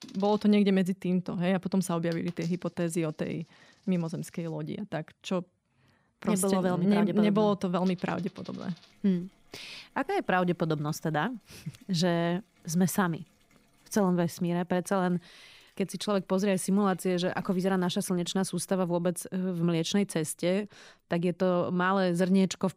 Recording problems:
household noises; faint; throughout; 30 dB below the speech

